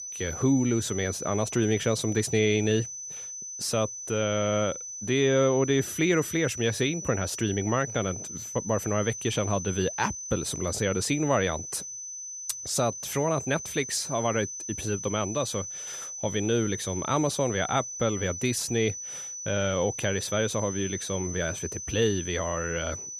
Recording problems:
high-pitched whine; loud; throughout; 6 kHz, 7 dB below the speech

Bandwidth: 14.5 kHz